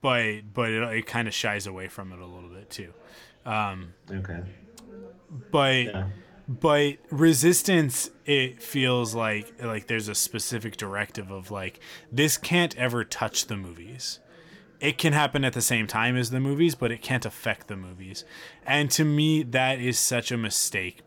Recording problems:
background chatter; faint; throughout; 2 voices, 30 dB below the speech

